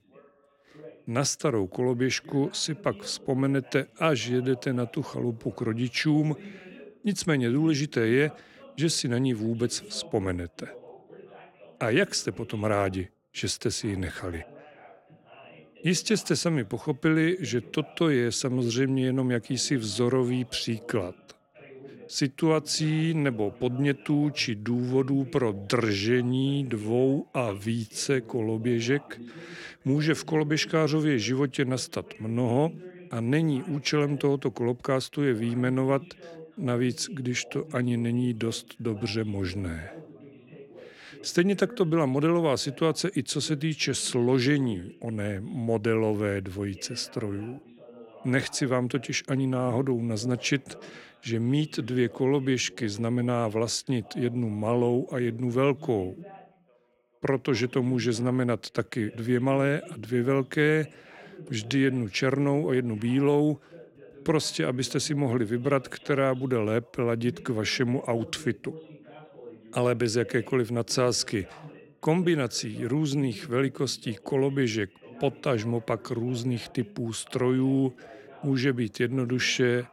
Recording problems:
background chatter; faint; throughout; 2 voices, 20 dB below the speech

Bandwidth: 16 kHz